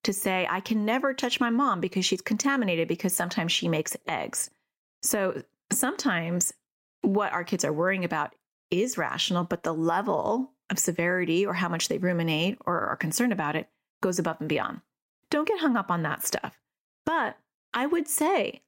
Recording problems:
squashed, flat; somewhat

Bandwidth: 16 kHz